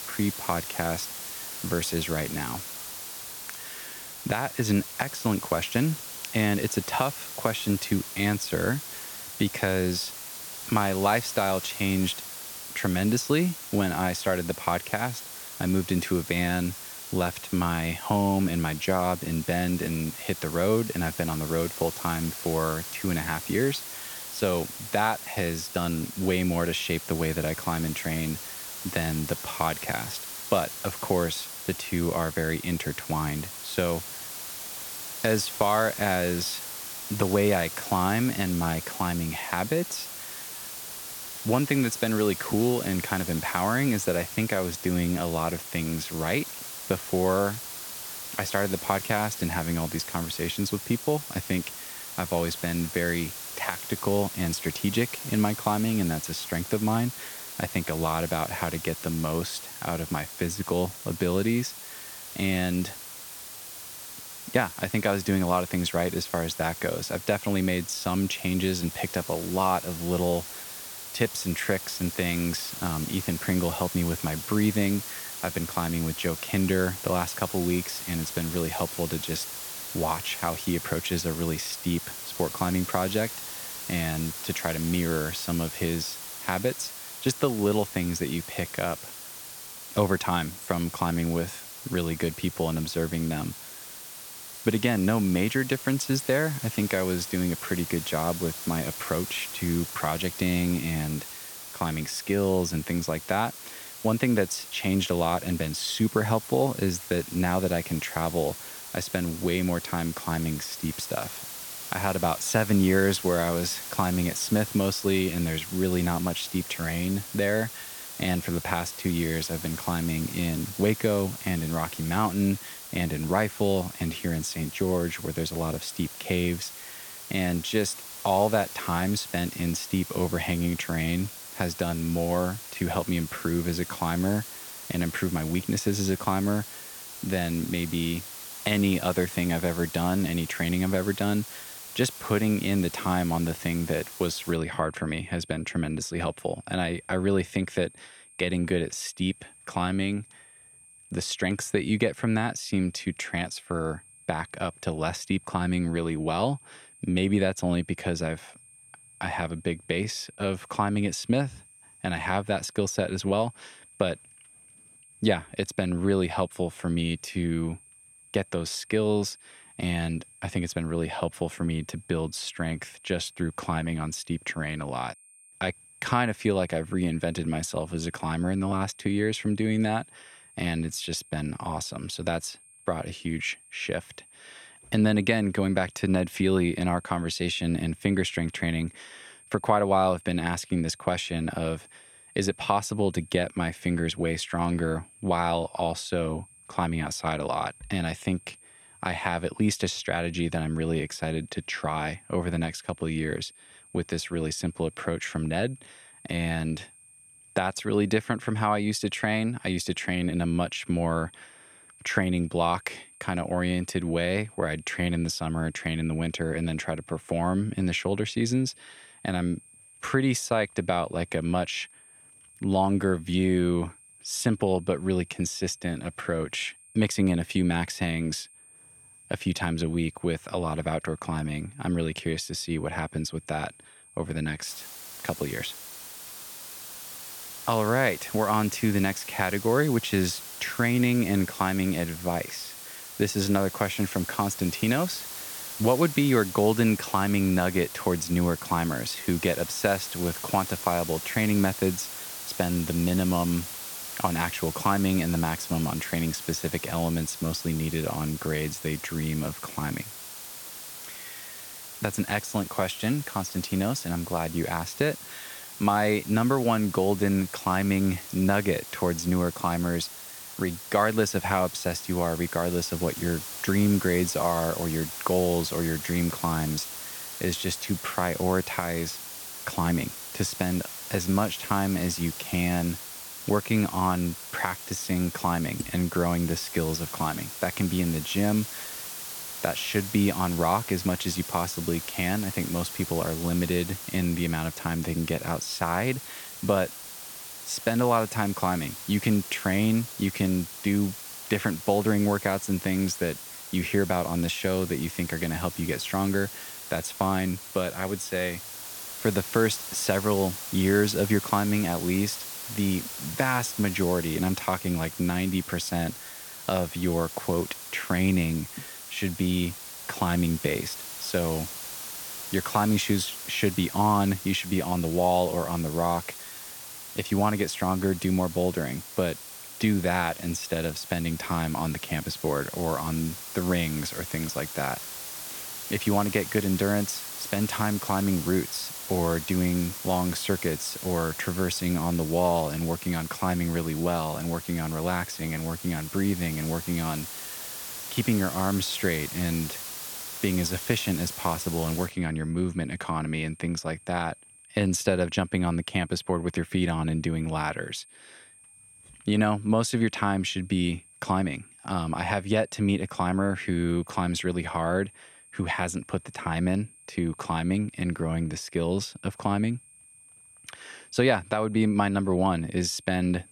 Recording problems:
hiss; loud; until 2:25 and from 3:55 to 5:52; 9 dB below the speech
high-pitched whine; faint; throughout; 8.5 kHz, 25 dB below the speech

